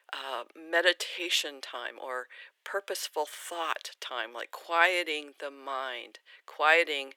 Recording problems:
thin; very; fading below 400 Hz

